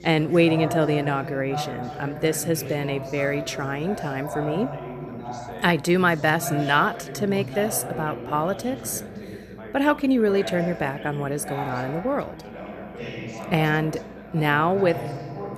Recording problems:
background chatter; loud; throughout; 3 voices, 10 dB below the speech

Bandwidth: 13.5 kHz